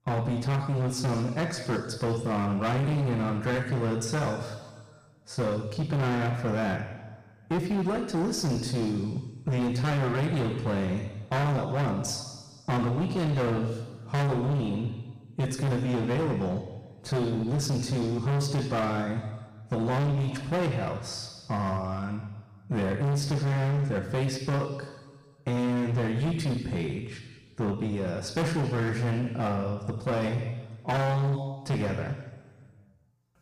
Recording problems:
distortion; heavy; 22% of the sound clipped
room echo; noticeable; dies away in 1.4 s
off-mic speech; somewhat distant

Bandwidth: 15 kHz